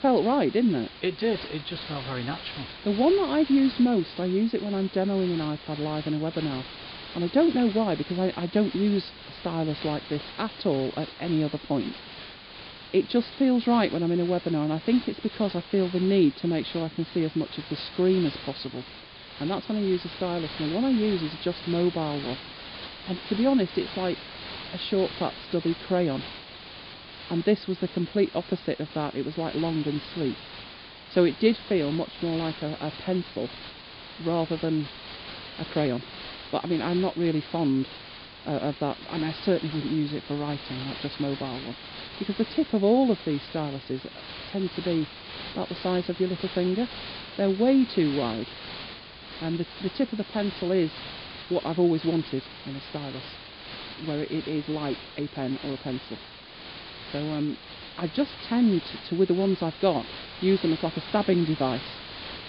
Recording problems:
high frequencies cut off; severe; nothing above 4.5 kHz
hiss; noticeable; throughout; 10 dB below the speech

